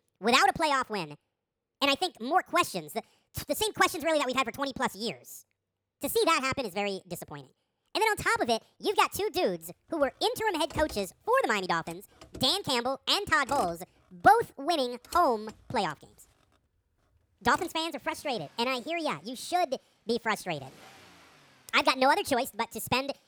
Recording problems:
wrong speed and pitch; too fast and too high; 1.6 times normal speed
traffic noise; faint; from 9 s on; 20 dB below the speech

